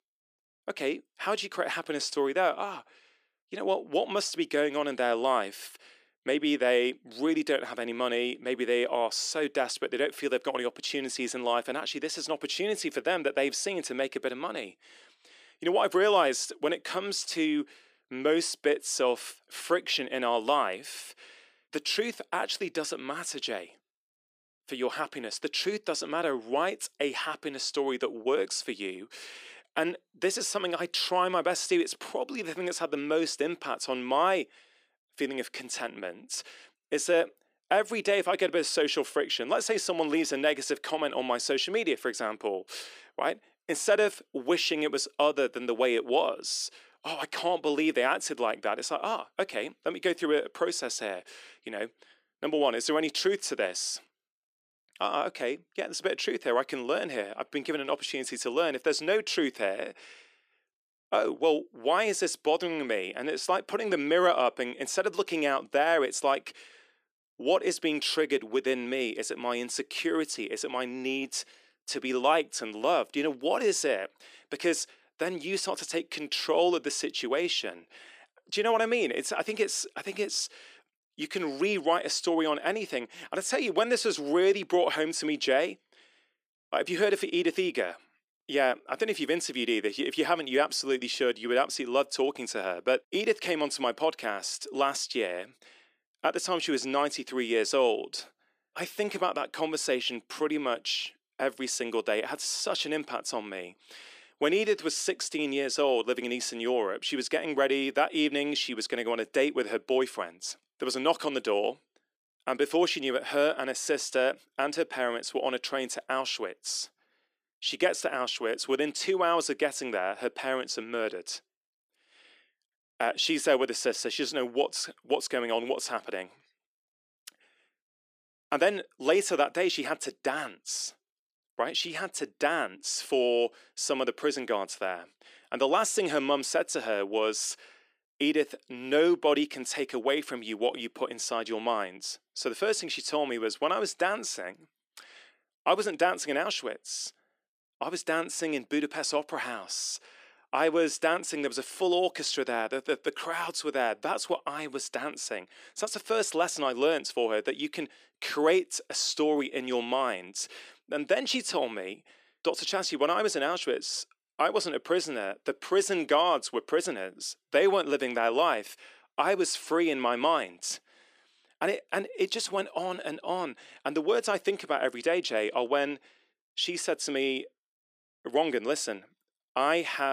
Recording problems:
thin; somewhat; fading below 300 Hz
abrupt cut into speech; at the end

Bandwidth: 15 kHz